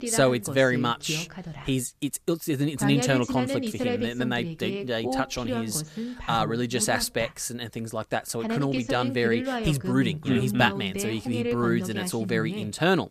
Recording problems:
voice in the background; loud; throughout; 5 dB below the speech

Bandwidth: 14.5 kHz